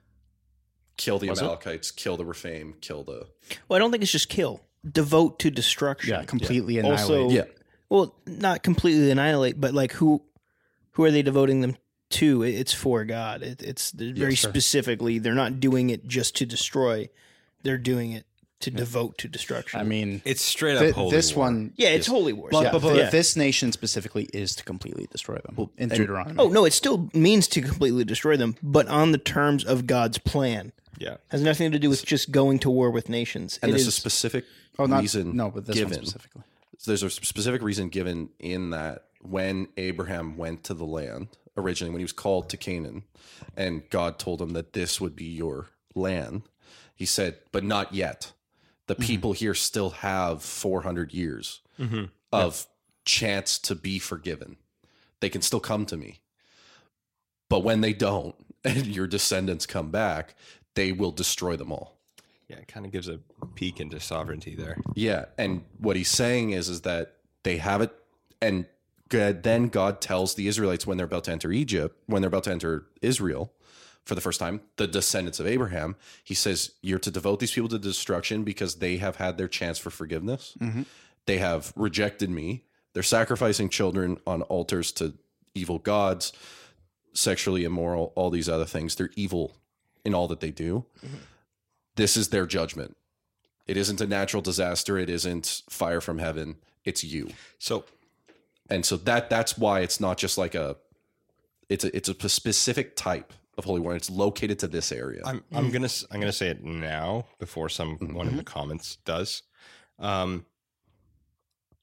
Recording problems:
uneven, jittery; slightly; from 18 s to 1:48

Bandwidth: 16 kHz